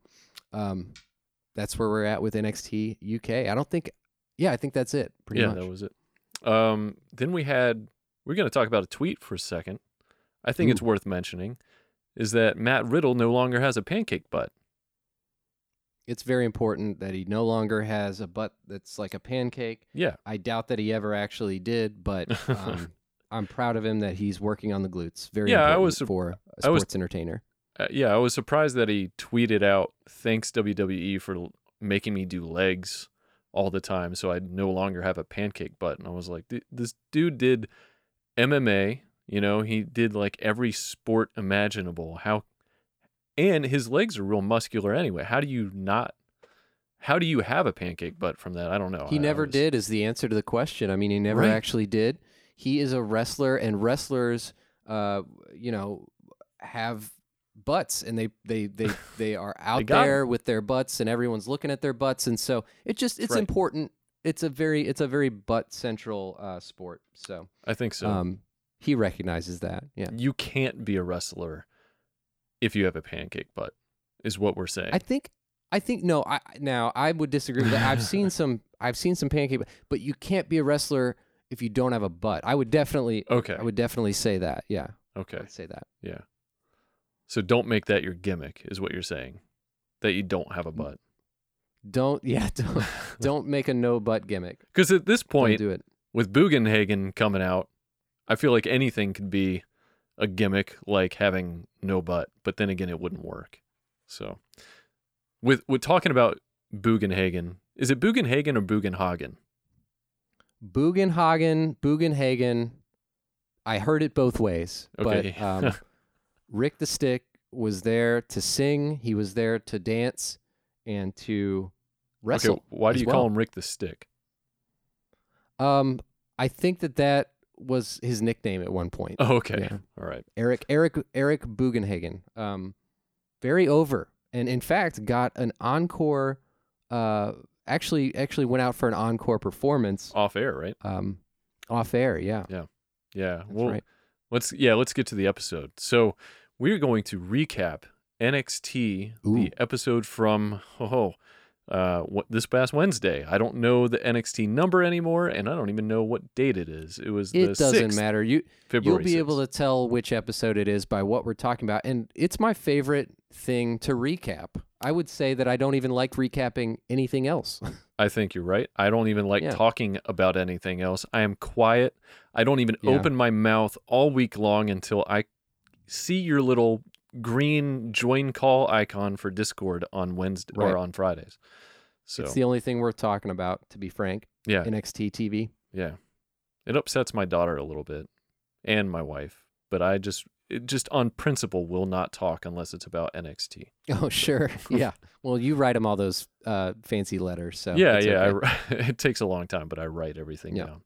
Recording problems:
none

